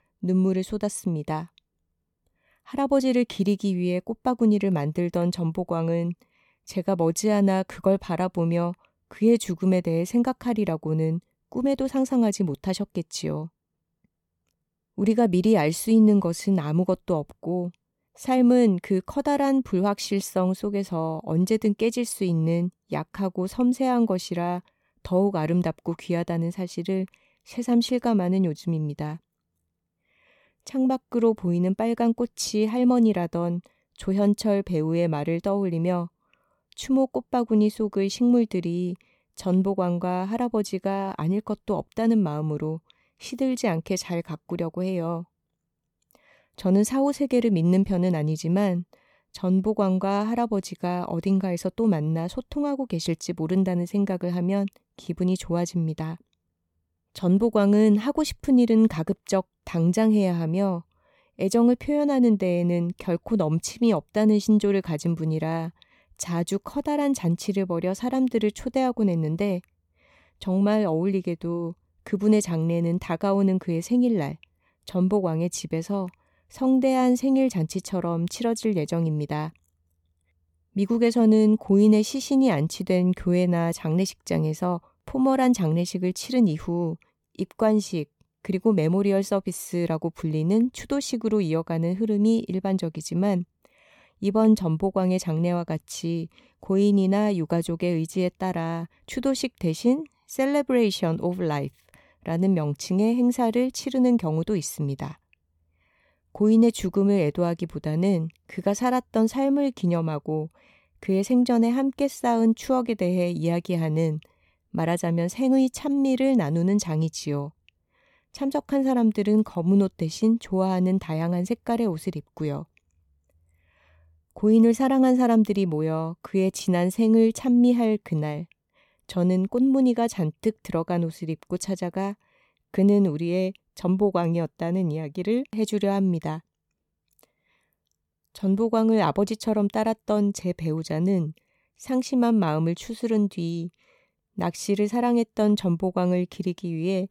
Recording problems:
none

